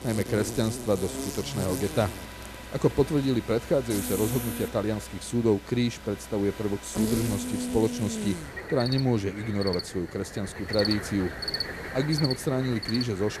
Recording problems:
animal sounds; loud; throughout; 6 dB below the speech

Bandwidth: 14 kHz